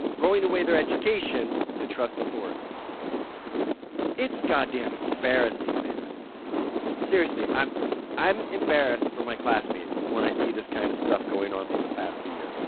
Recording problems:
phone-call audio; poor line; nothing above 4 kHz
traffic noise; loud; throughout; 3 dB below the speech

